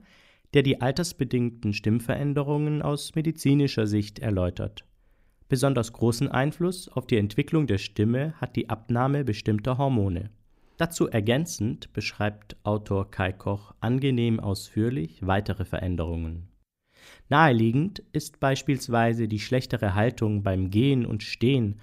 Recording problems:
none

